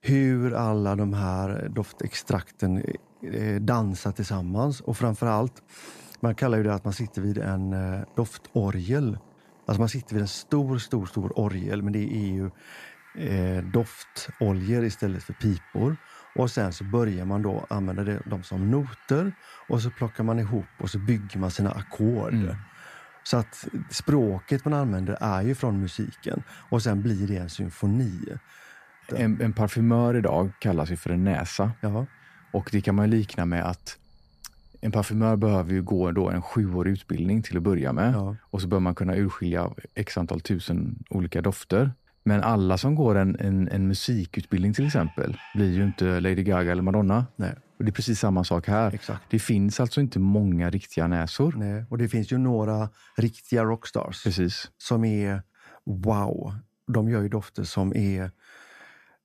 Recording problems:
animal sounds; faint; throughout; 25 dB below the speech

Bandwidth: 14.5 kHz